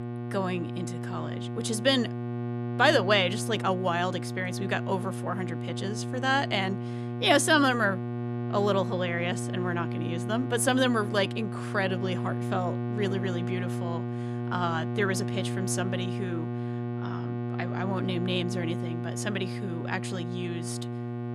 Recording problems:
electrical hum; noticeable; throughout; 60 Hz, 10 dB below the speech

